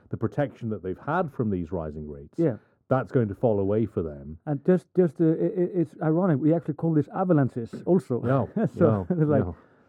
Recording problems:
muffled; very; fading above 1 kHz

